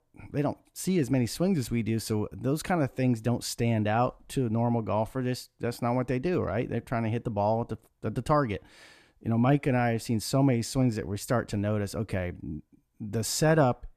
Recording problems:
none

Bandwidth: 14.5 kHz